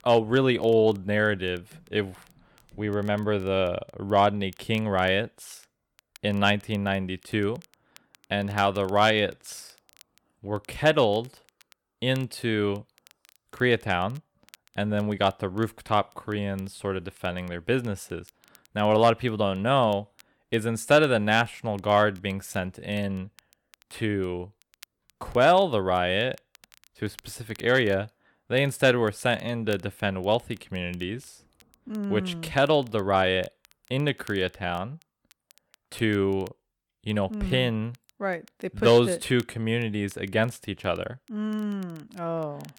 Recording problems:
crackle, like an old record; faint; 30 dB below the speech

